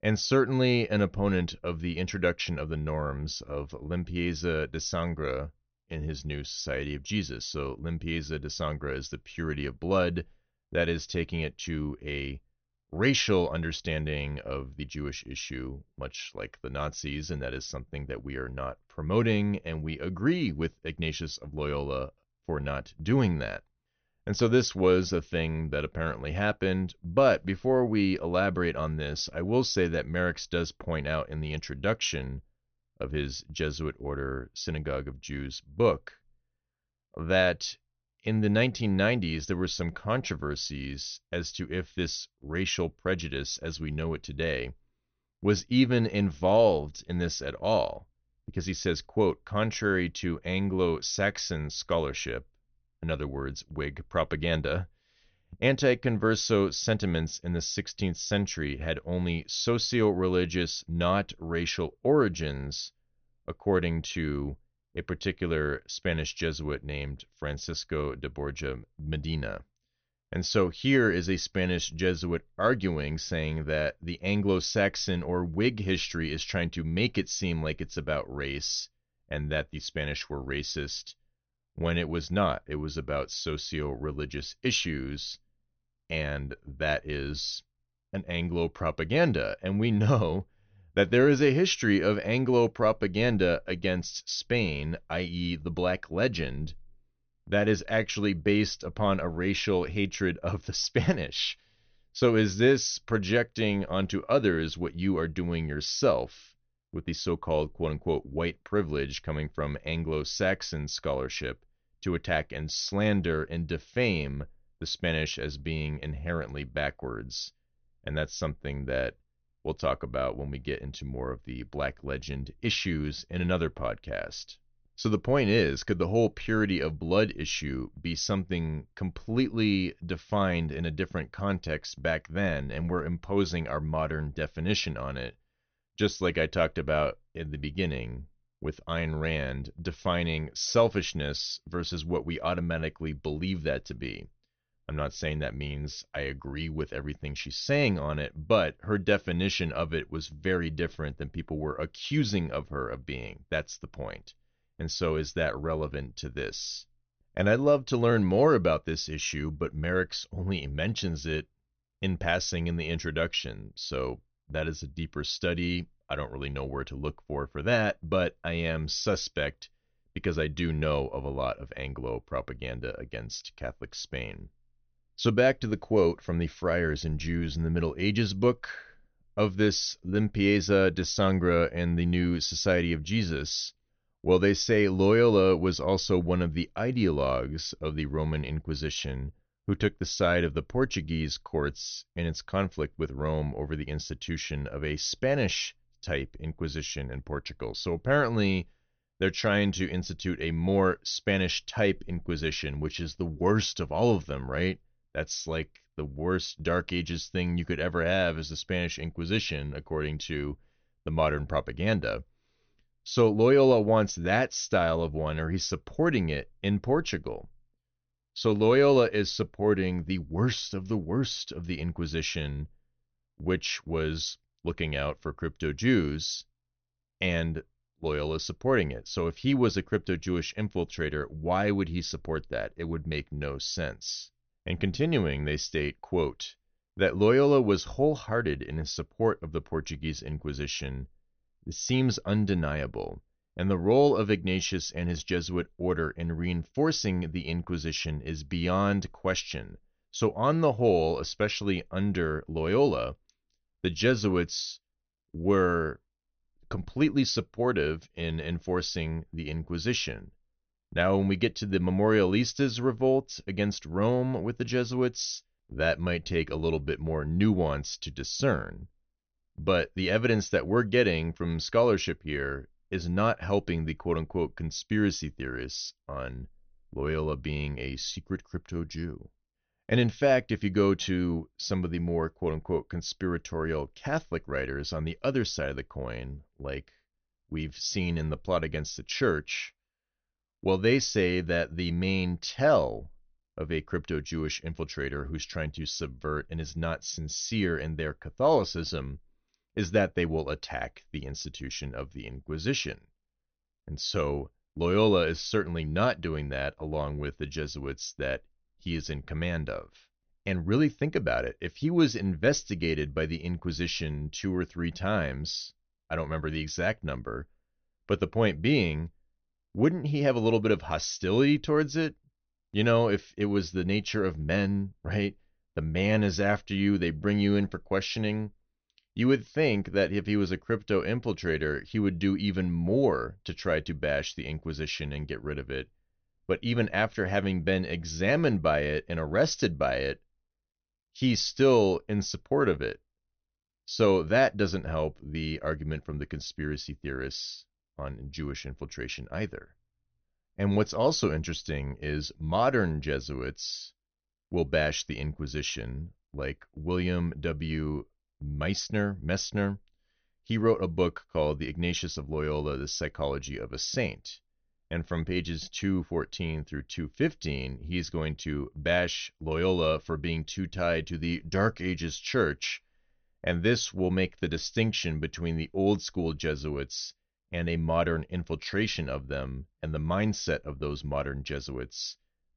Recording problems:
high frequencies cut off; noticeable; nothing above 6 kHz

